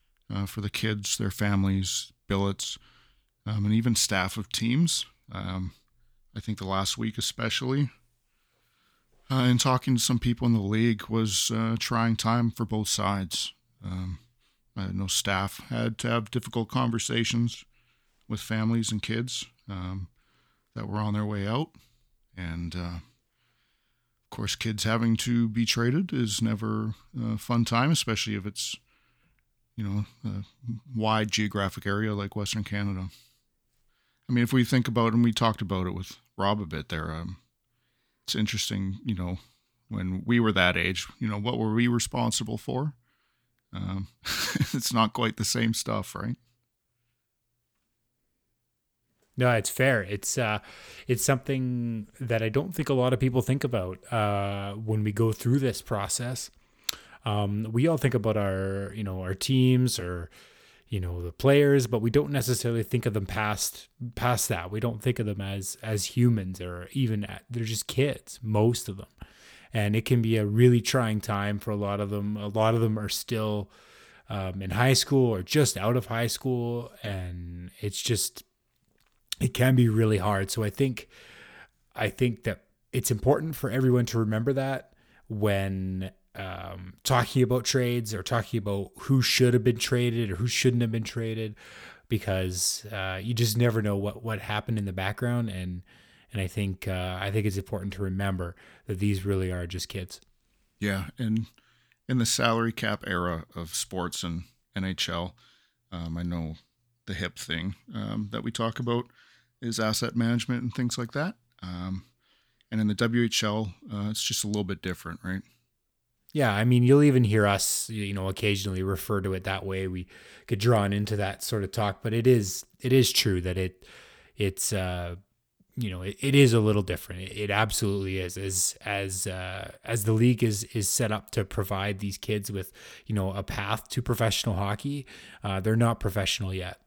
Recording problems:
none

